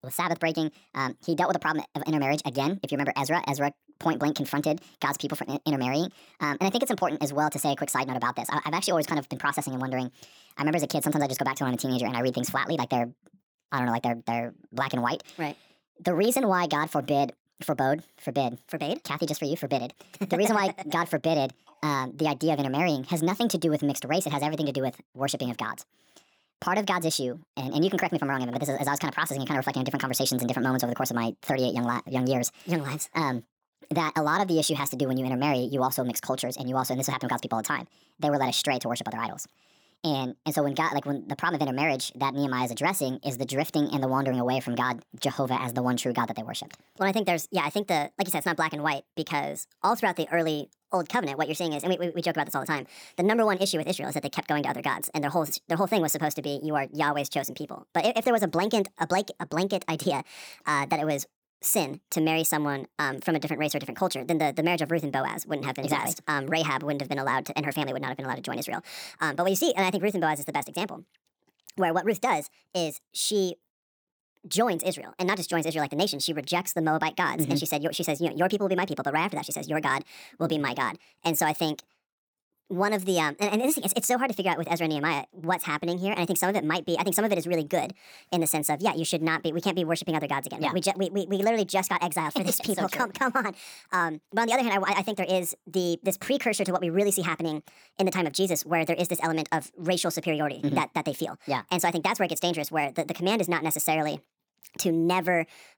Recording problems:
wrong speed and pitch; too fast and too high; 1.5 times normal speed

